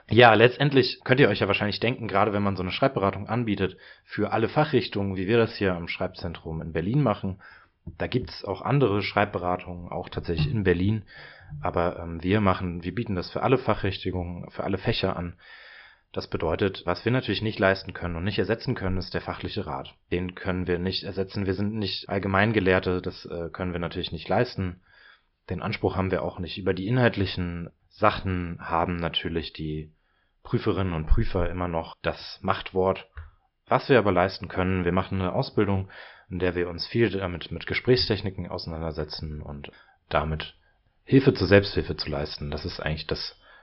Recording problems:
high frequencies cut off; noticeable; nothing above 5 kHz

